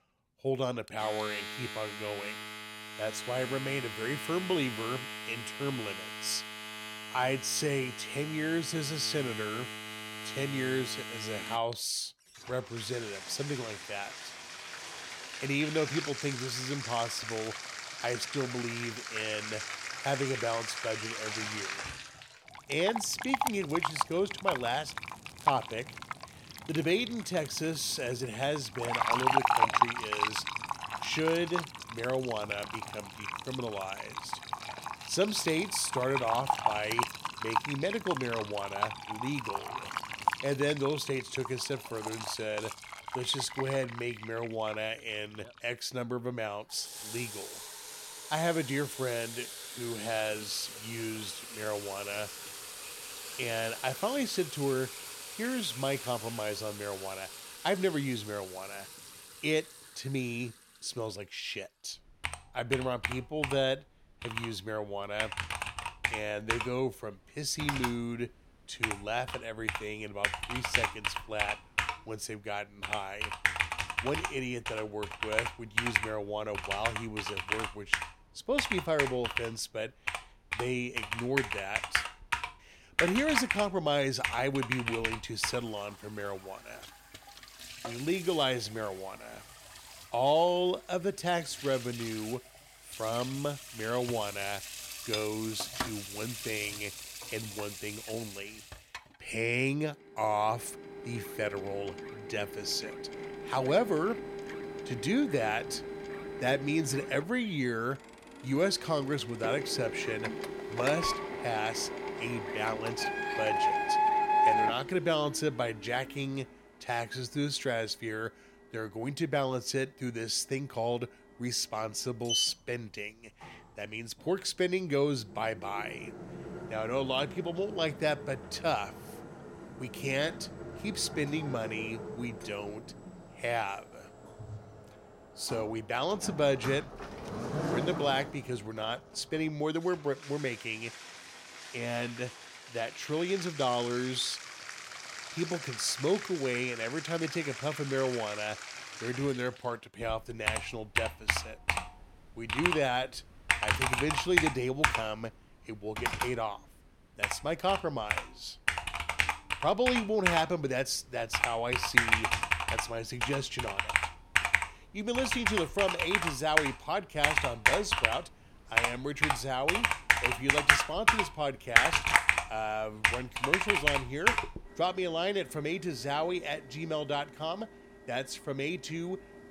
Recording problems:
household noises; loud; throughout; as loud as the speech

